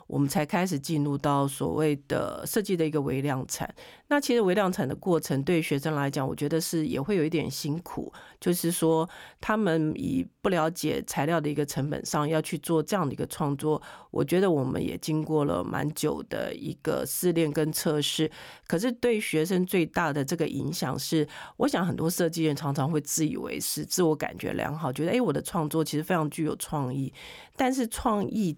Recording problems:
none

